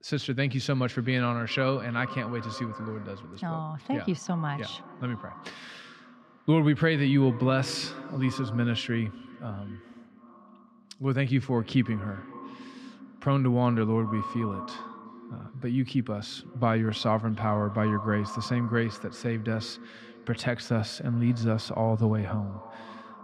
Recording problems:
echo of what is said; noticeable; throughout; 370 ms later, 15 dB below the speech
muffled; very slightly; fading above 3 kHz

